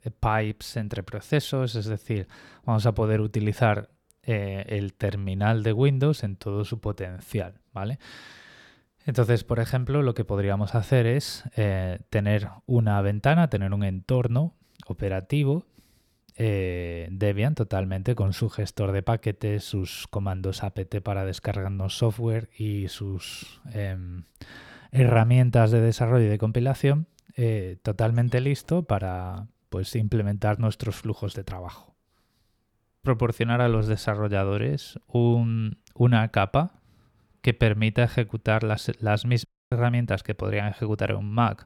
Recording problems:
audio cutting out; at 39 s

